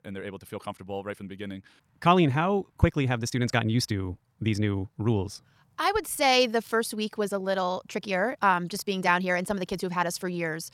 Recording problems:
wrong speed, natural pitch; too fast; 1.5 times normal speed

